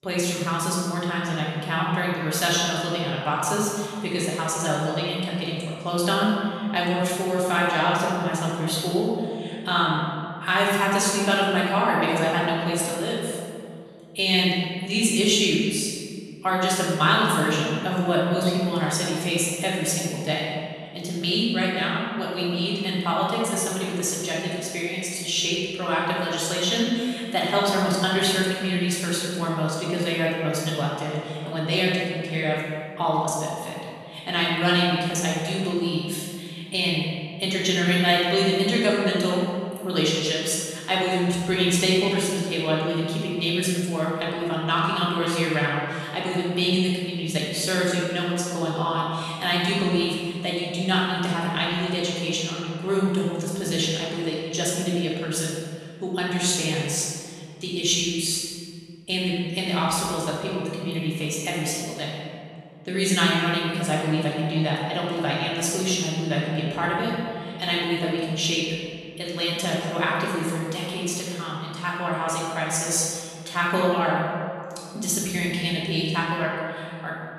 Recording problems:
room echo; strong; dies away in 2.1 s
off-mic speech; far

